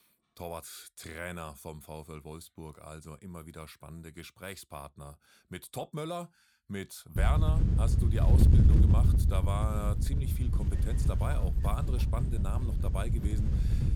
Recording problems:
wind noise on the microphone; heavy; from 7 s on; 1 dB below the speech

